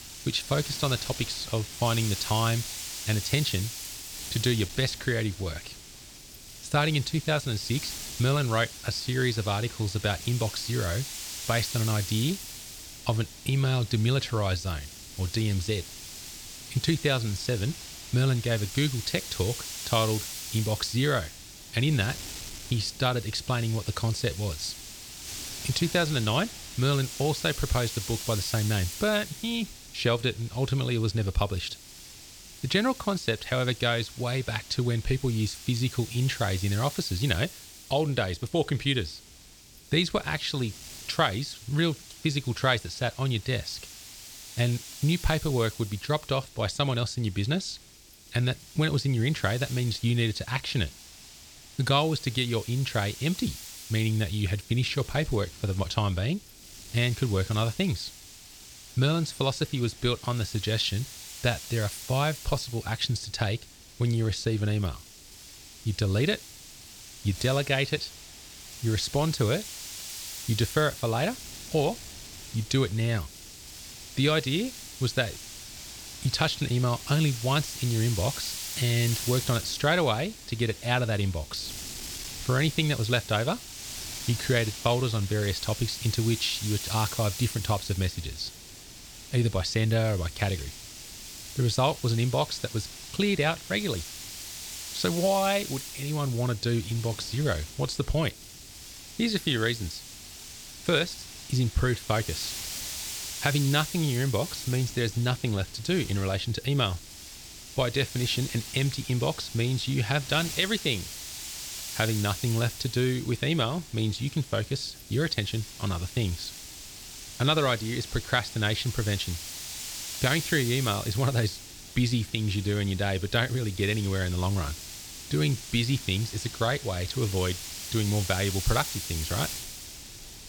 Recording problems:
wind noise on the microphone; heavy; 10 dB below the speech

